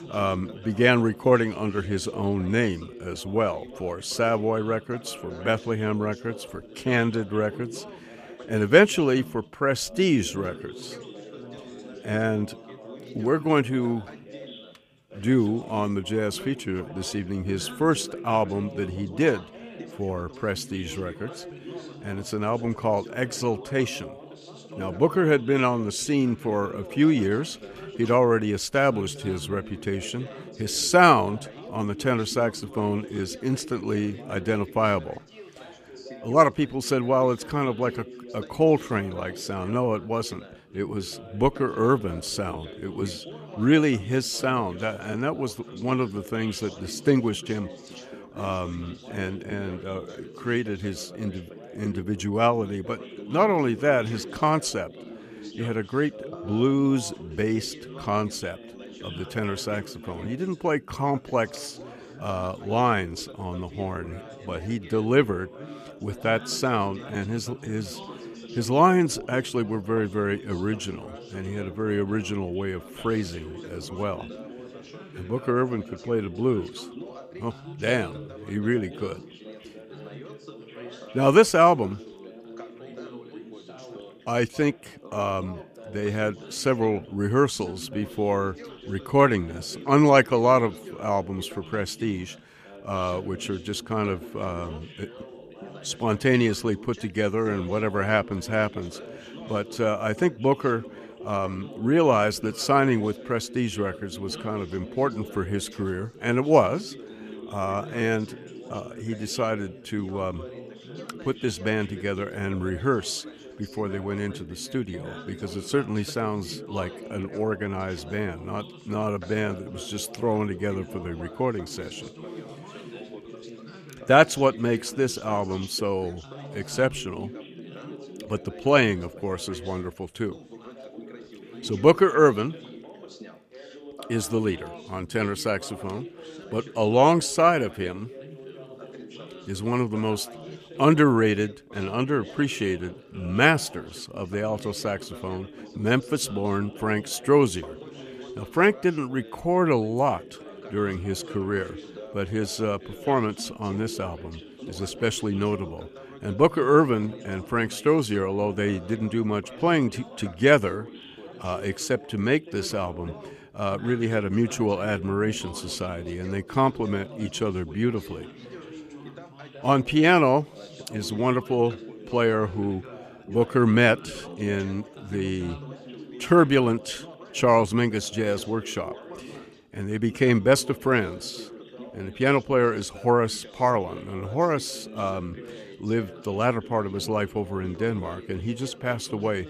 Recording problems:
background chatter; noticeable; throughout; 3 voices, 15 dB below the speech

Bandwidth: 15 kHz